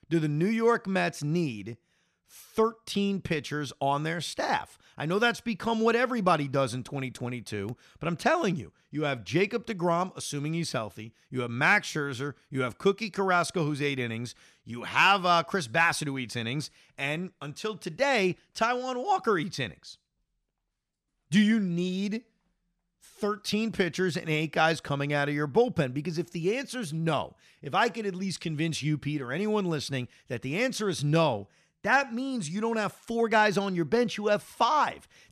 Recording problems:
none

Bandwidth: 14.5 kHz